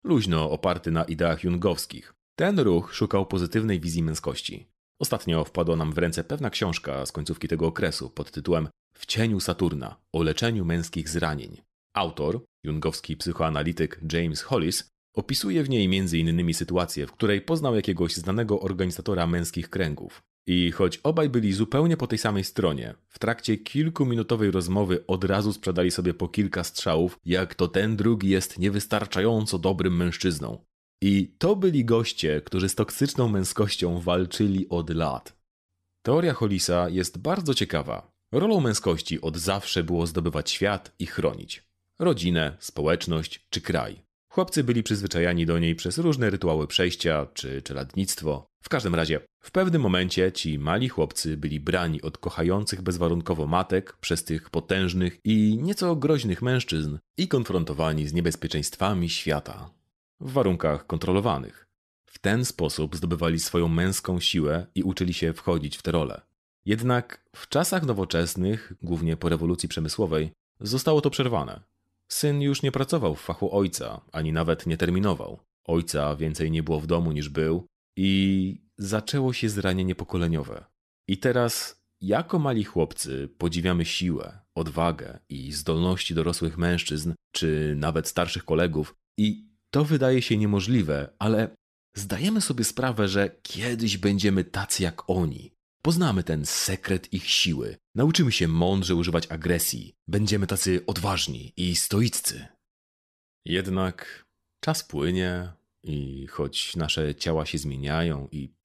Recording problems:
none

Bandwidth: 13.5 kHz